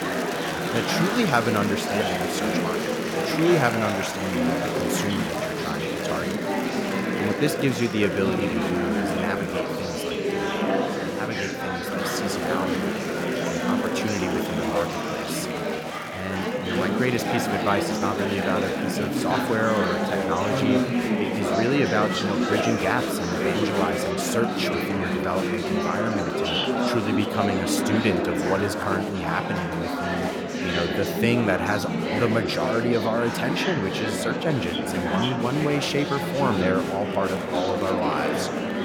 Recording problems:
murmuring crowd; very loud; throughout; 2 dB above the speech

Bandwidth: 17.5 kHz